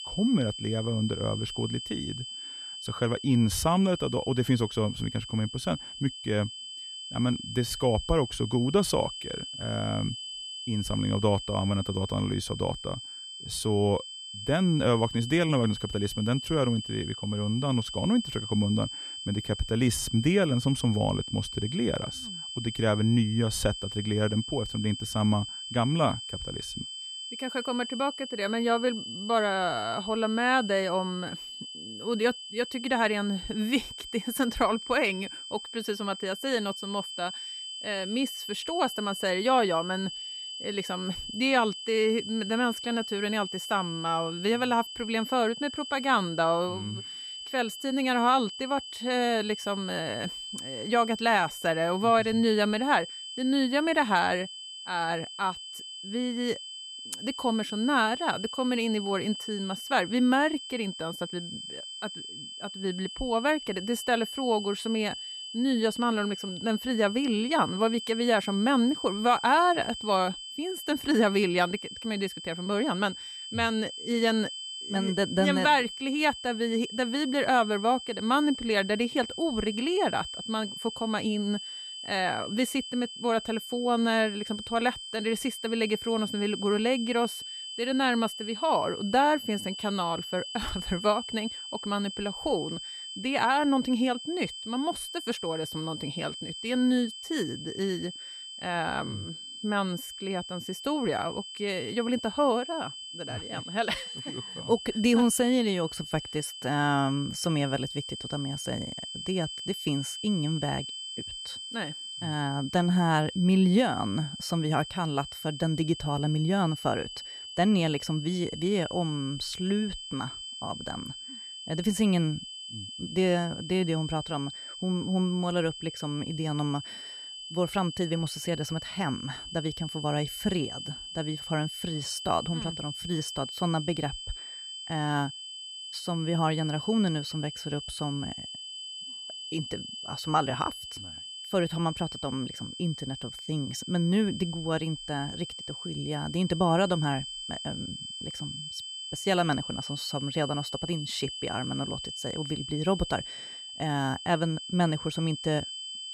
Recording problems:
high-pitched whine; loud; throughout; 3 kHz, 9 dB below the speech

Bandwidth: 14 kHz